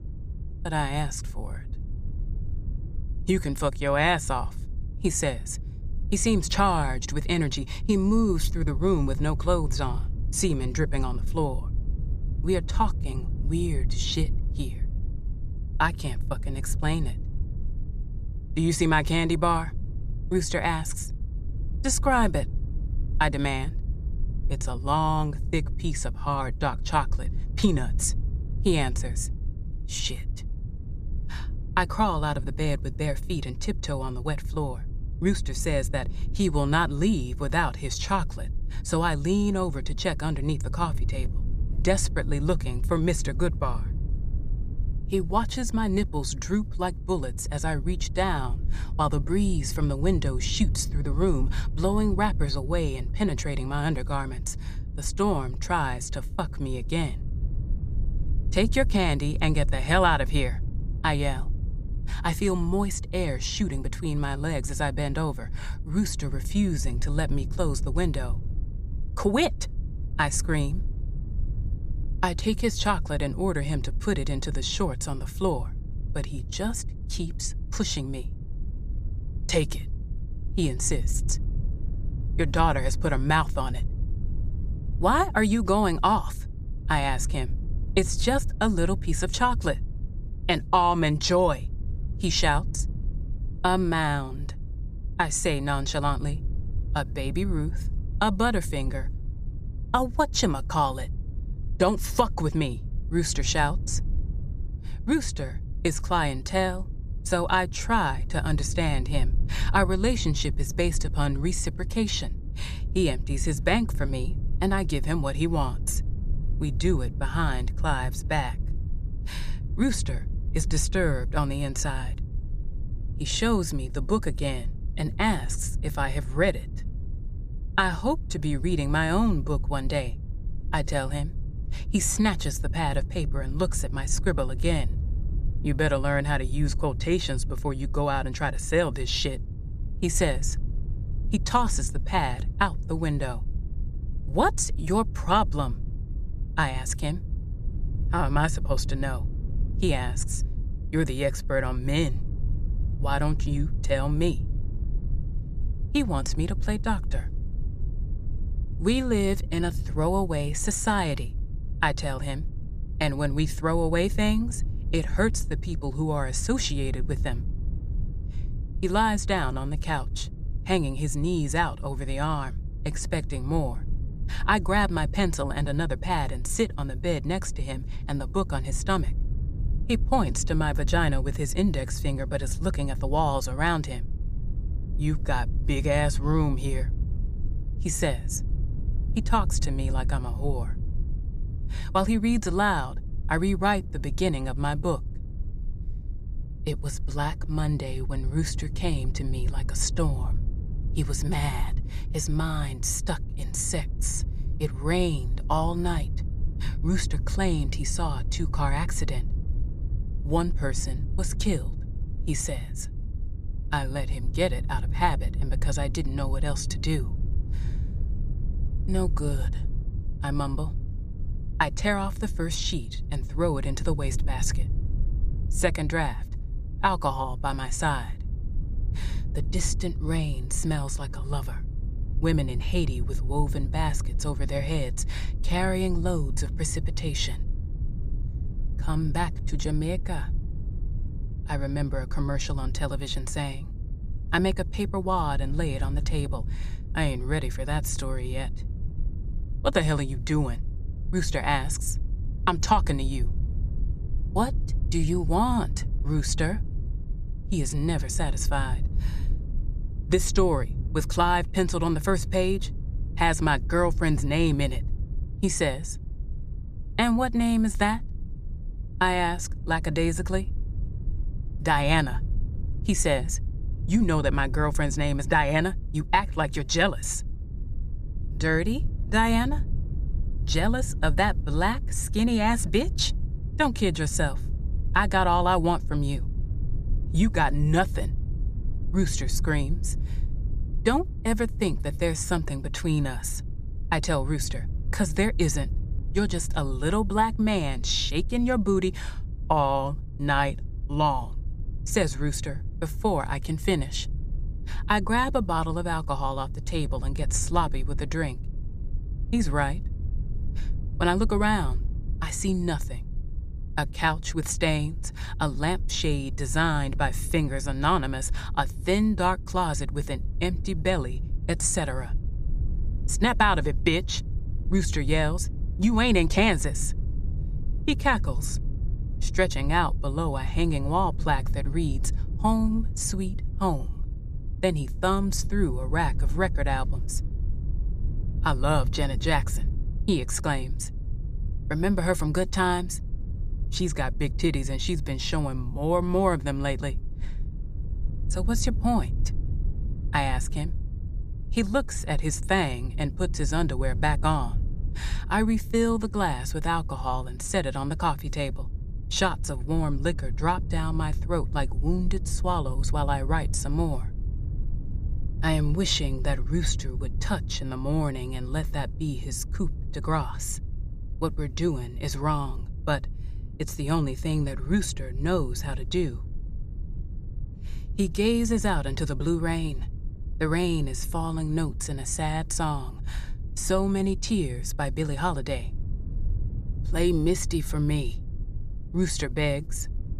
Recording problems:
low rumble; faint; throughout; 20 dB below the speech

